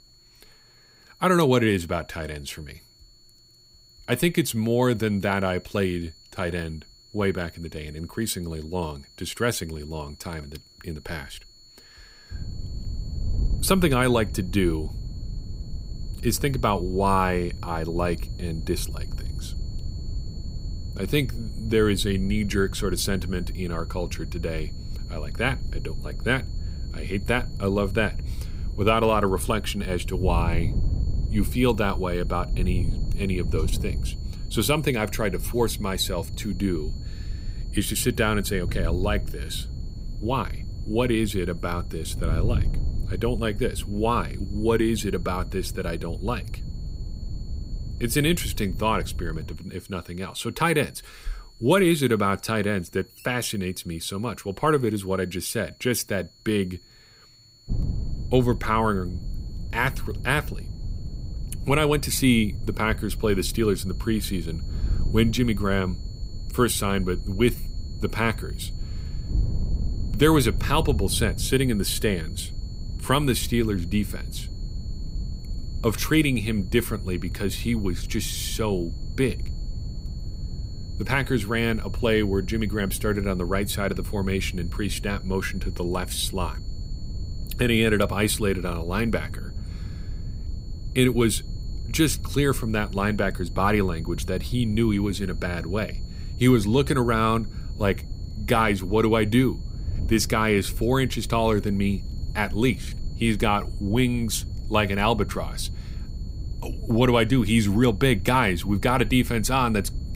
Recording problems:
wind noise on the microphone; occasional gusts; from 12 to 50 s and from 58 s on; 20 dB below the speech
high-pitched whine; faint; throughout; 4.5 kHz, 25 dB below the speech

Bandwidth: 15.5 kHz